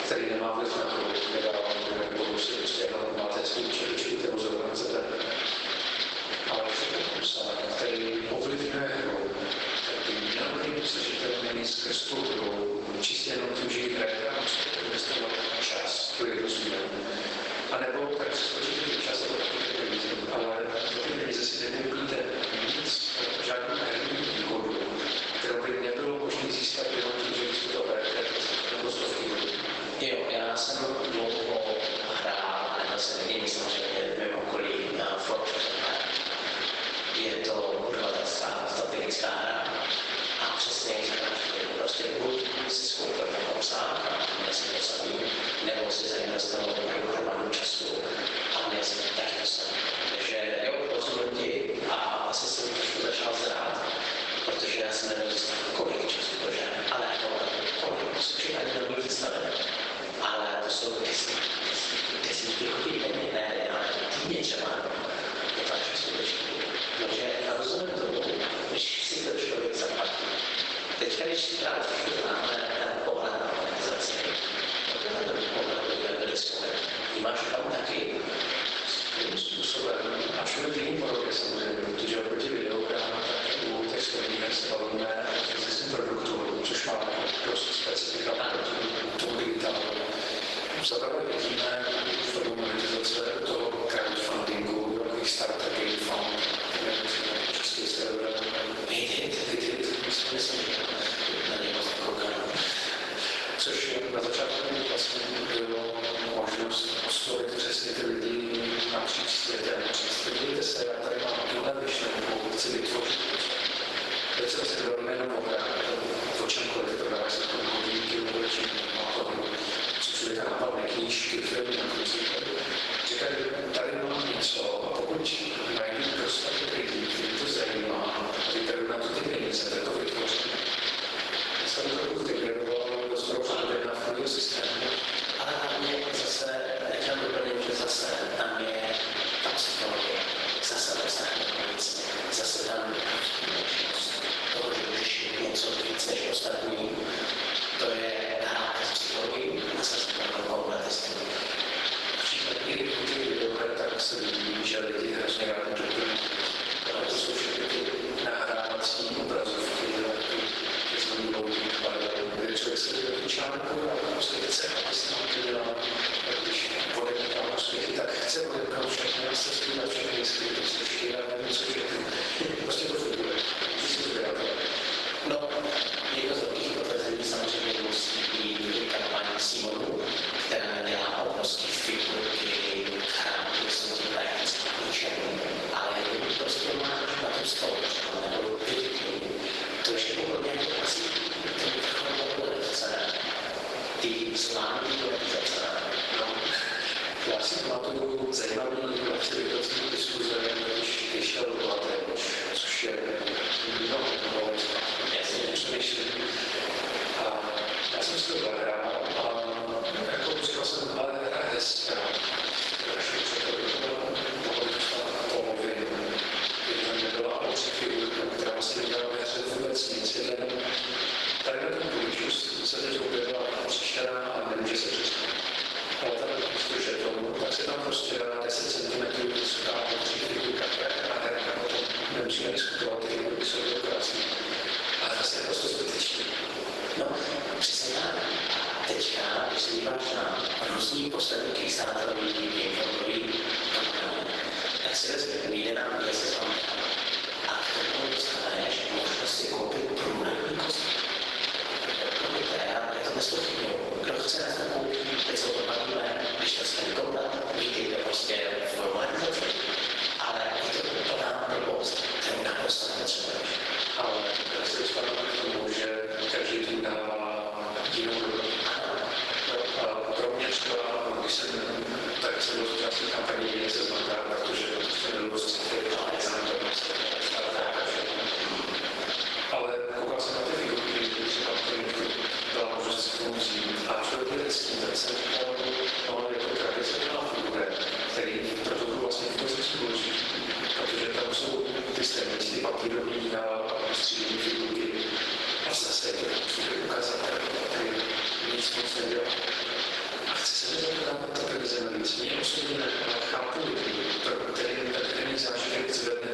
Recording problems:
room echo; strong; dies away in 1.2 s
off-mic speech; far
garbled, watery; badly; nothing above 12 kHz
thin; very; fading below 400 Hz
squashed, flat; somewhat
wind noise on the microphone; heavy; 2 dB below the speech

